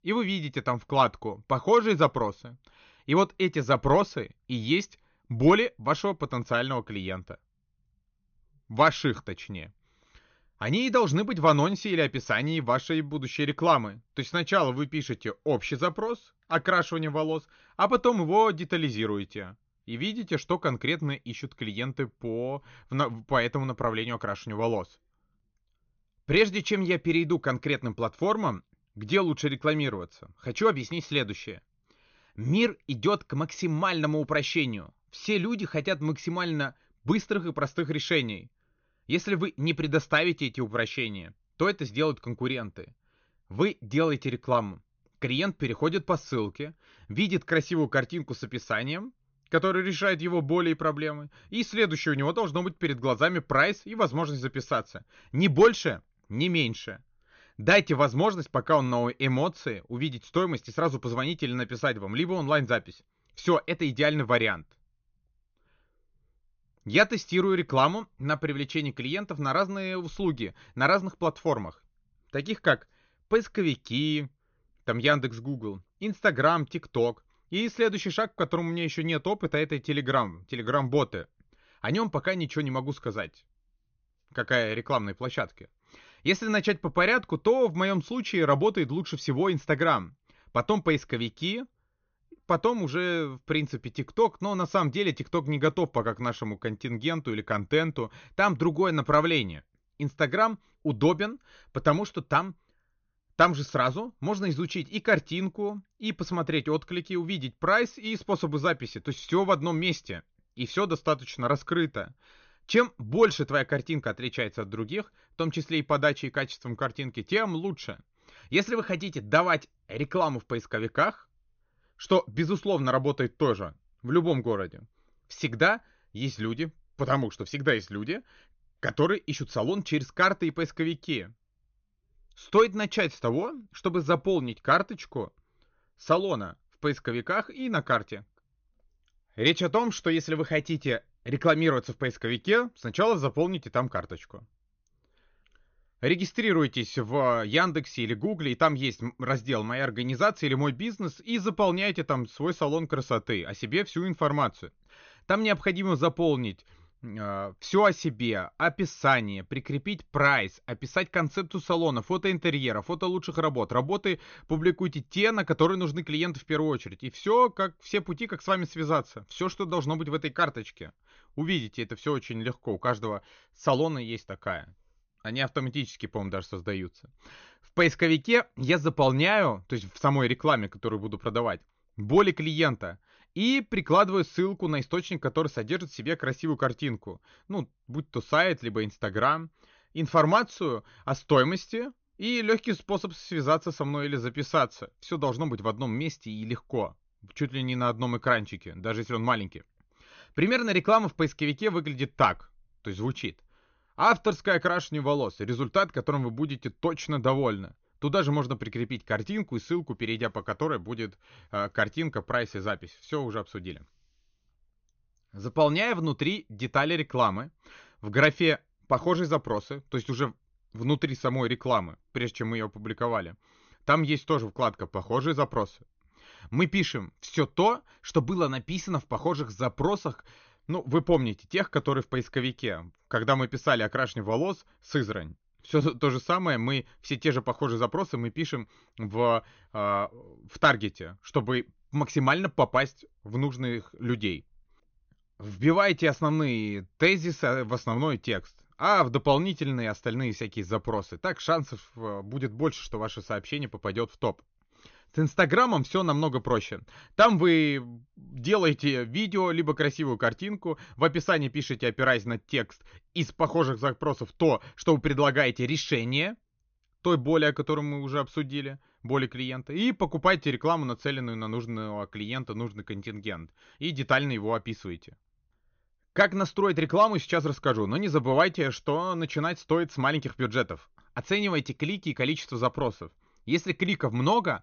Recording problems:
high frequencies cut off; noticeable; nothing above 6.5 kHz

